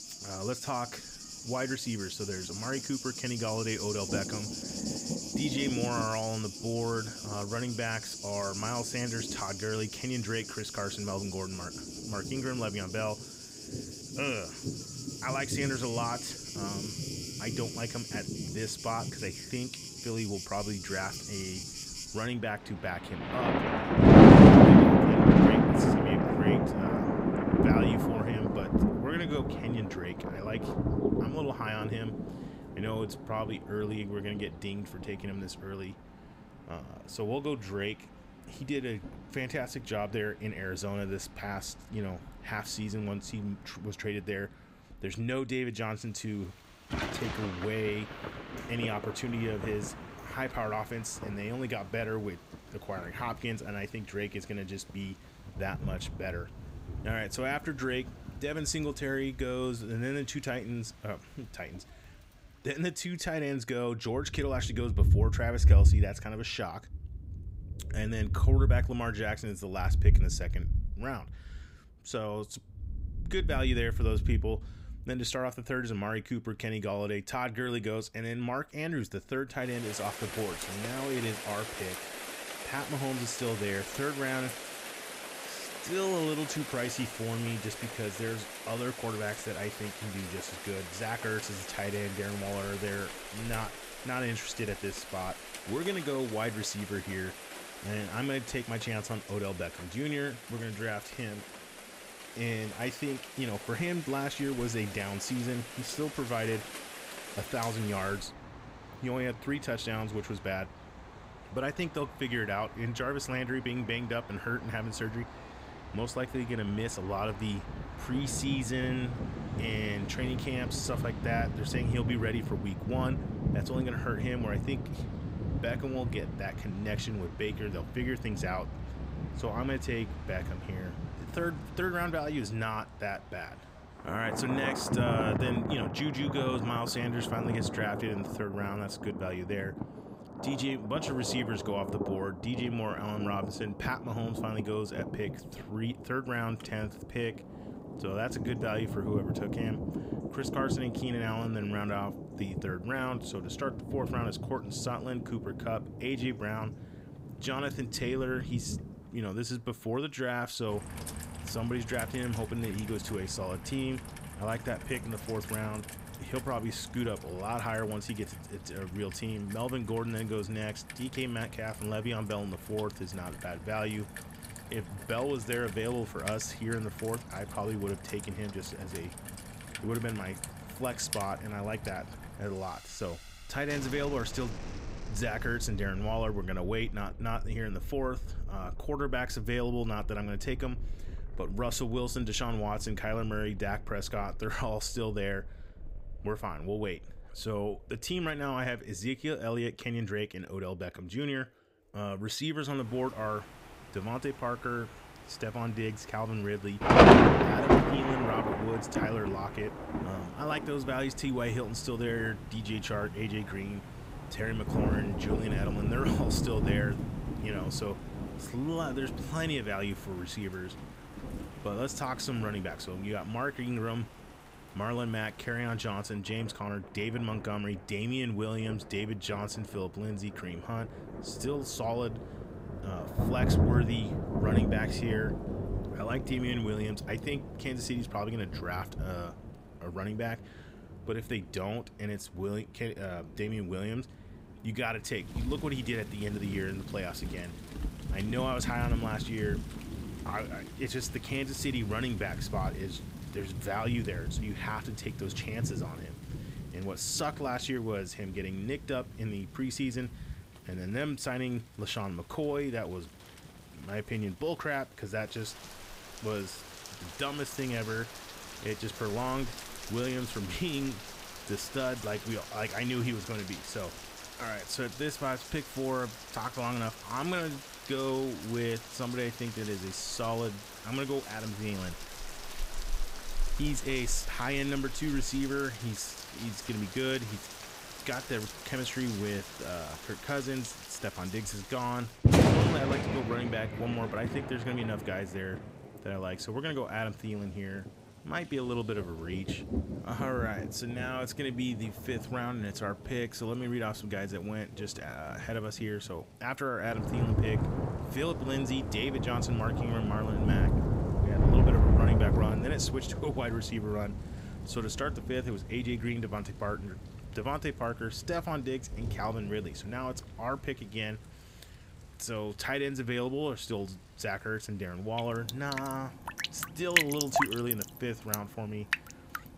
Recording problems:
rain or running water; very loud; throughout; 4 dB above the speech

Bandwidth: 15.5 kHz